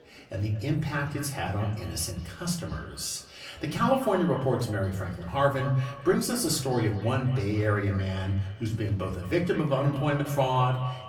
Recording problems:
off-mic speech; far
echo of what is said; noticeable; throughout; 220 ms later, 15 dB below the speech
room echo; very slight; dies away in 0.4 s
murmuring crowd; faint; throughout; 30 dB below the speech

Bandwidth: 18.5 kHz